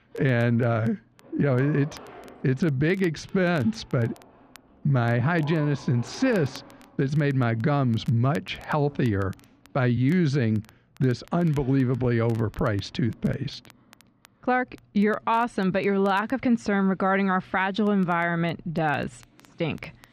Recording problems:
muffled; slightly; fading above 3.5 kHz
household noises; faint; throughout; 25 dB below the speech
crackle, like an old record; faint; 30 dB below the speech
uneven, jittery; strongly; from 1 to 19 s

